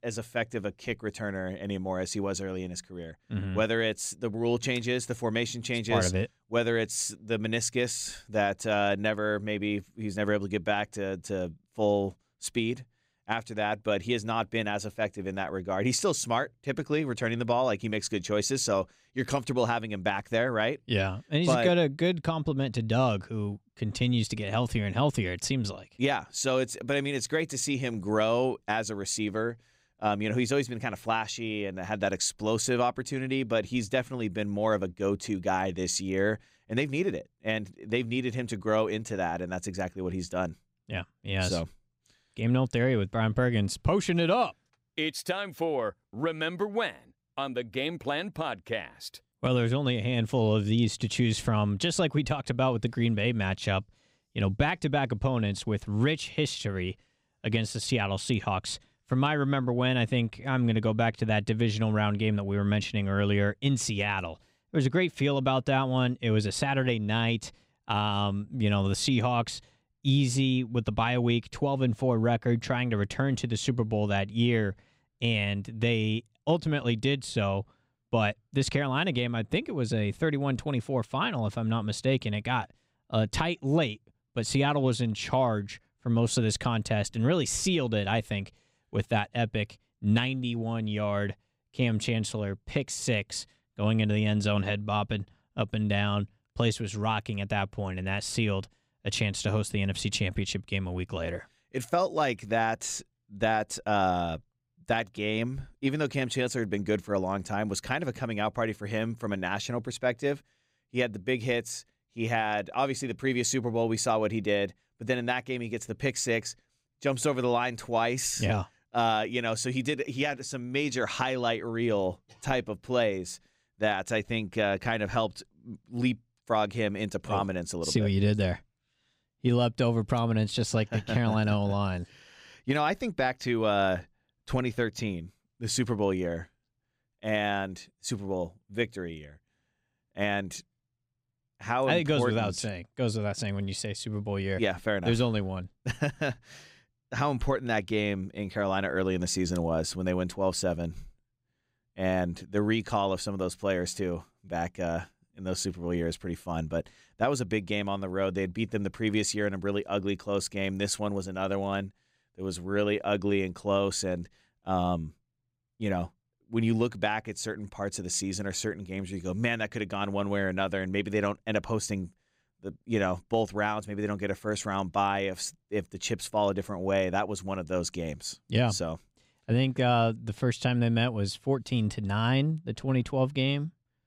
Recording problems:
none

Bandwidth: 15.5 kHz